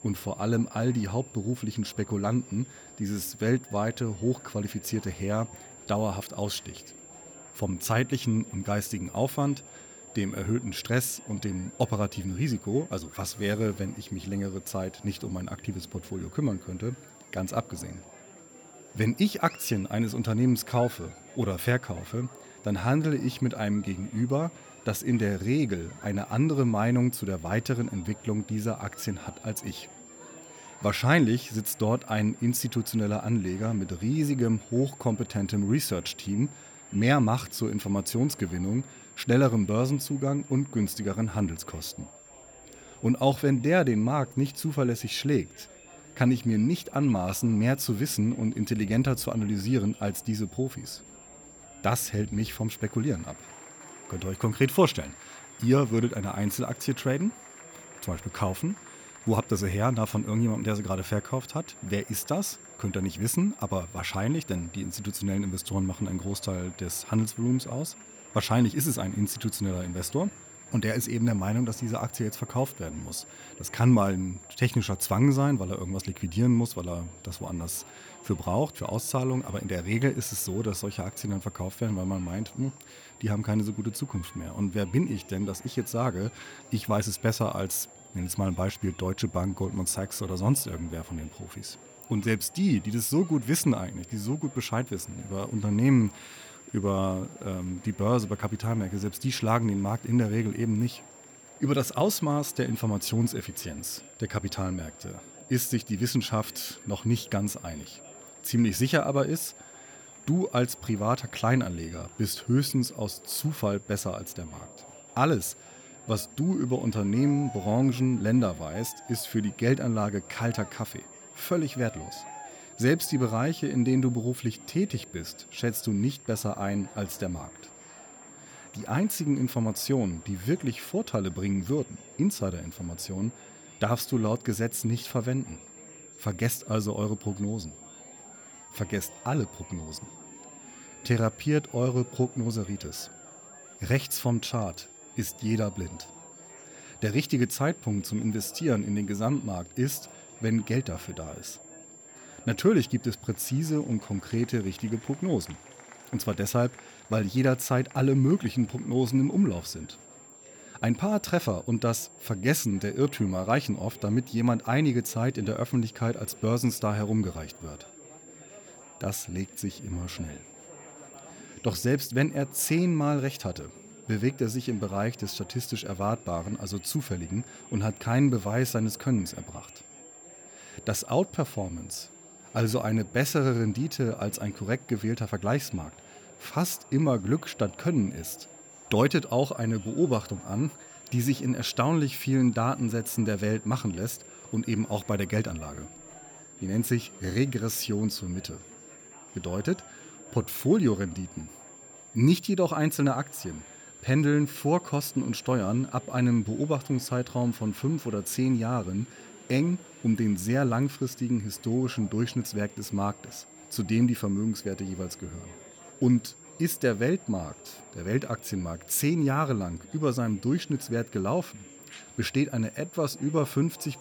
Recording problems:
high-pitched whine; faint; throughout; 7.5 kHz, 20 dB below the speech
murmuring crowd; faint; throughout; 25 dB below the speech

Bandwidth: 18.5 kHz